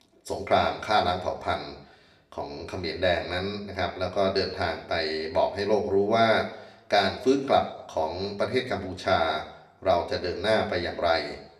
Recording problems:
room echo; very slight; dies away in 0.6 s
off-mic speech; somewhat distant

